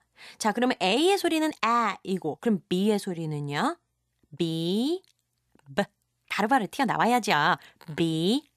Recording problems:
uneven, jittery; strongly; from 1 to 8 s

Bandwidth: 14 kHz